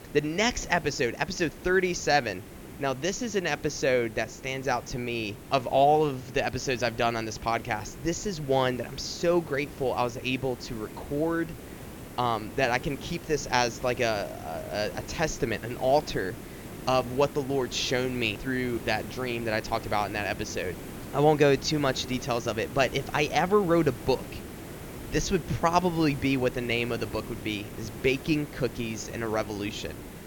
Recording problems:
high frequencies cut off; noticeable; nothing above 7.5 kHz
hiss; noticeable; throughout; 15 dB below the speech

